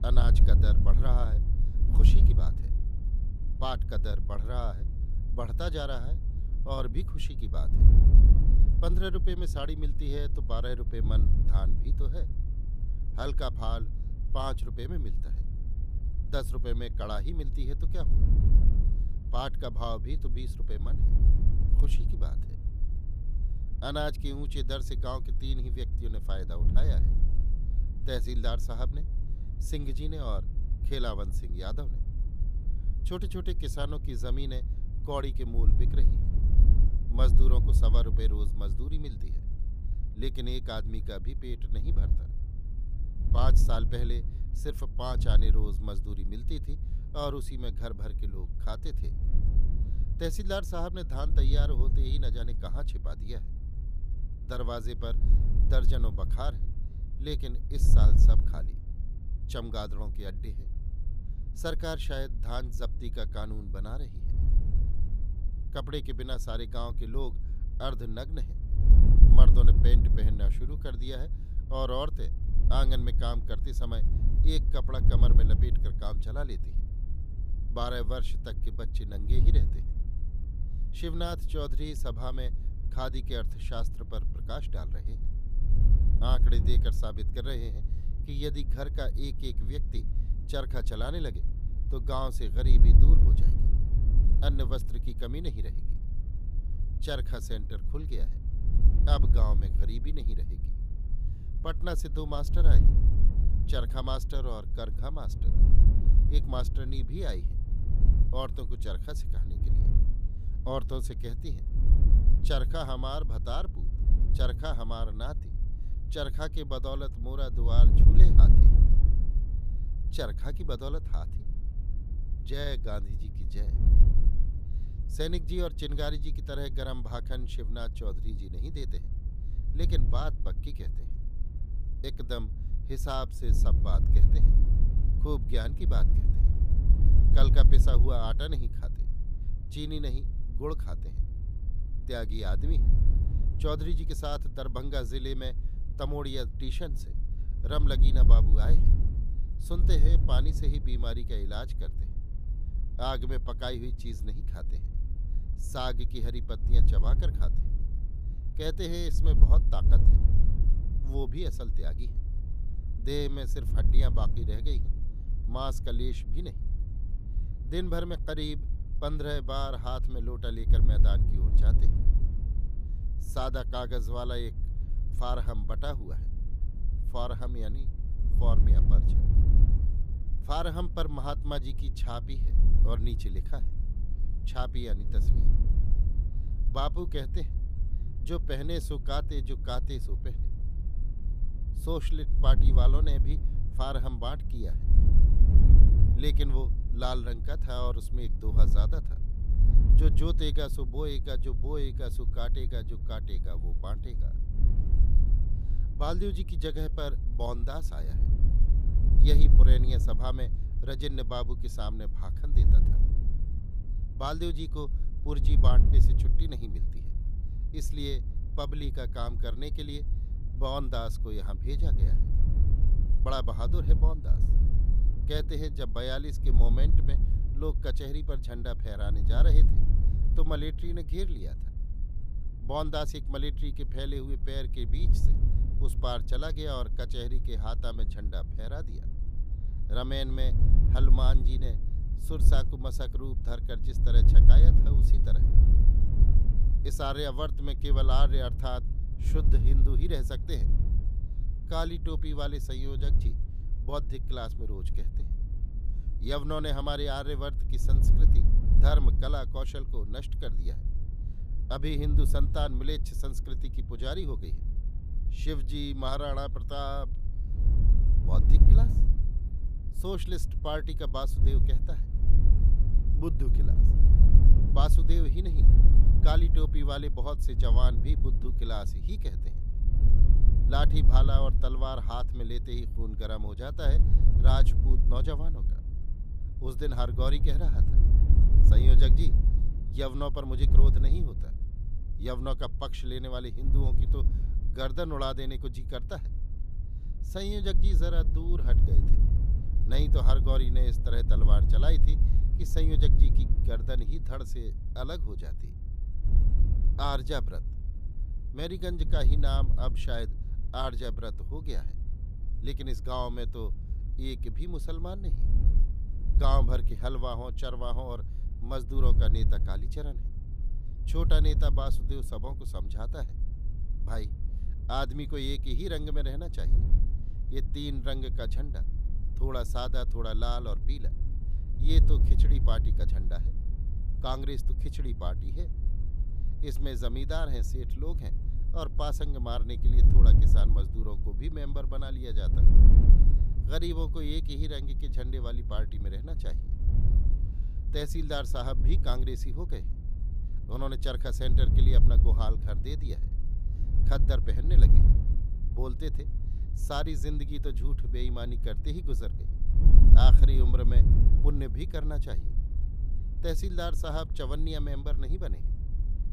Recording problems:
wind noise on the microphone; heavy; 9 dB below the speech

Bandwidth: 15 kHz